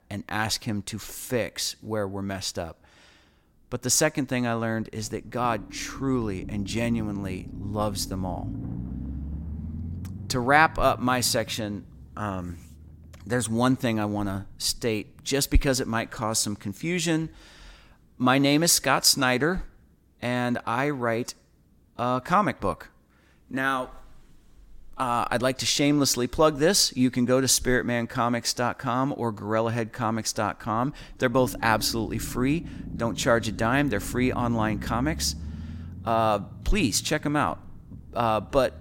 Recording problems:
low rumble; faint; throughout; 20 dB below the speech

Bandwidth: 16.5 kHz